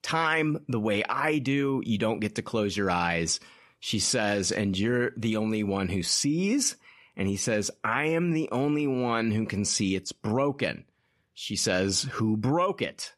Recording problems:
none

